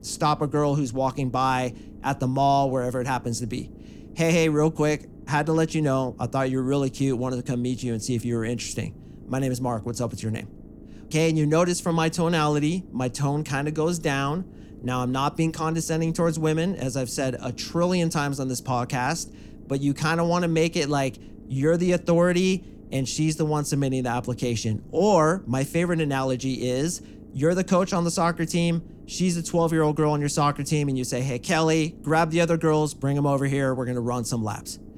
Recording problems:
low rumble; faint; throughout; 25 dB below the speech

